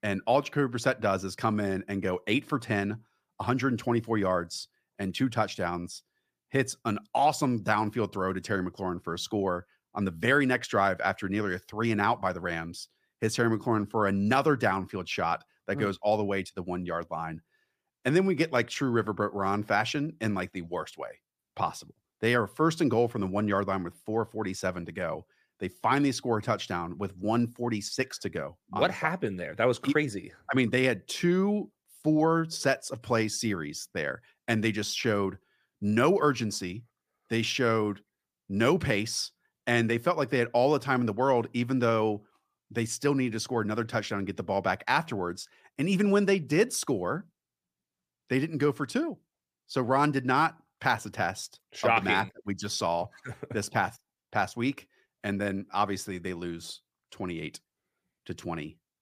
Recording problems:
none

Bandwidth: 15 kHz